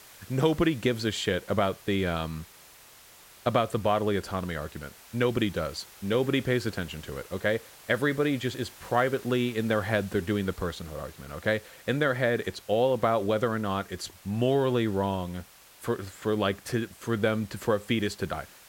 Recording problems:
hiss; faint; throughout; 20 dB below the speech

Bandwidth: 16.5 kHz